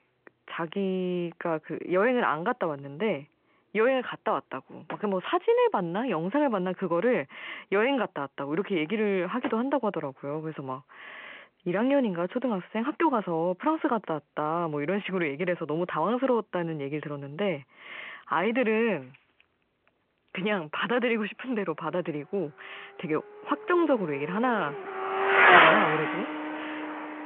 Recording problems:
phone-call audio
traffic noise; very loud; throughout; 5 dB above the speech

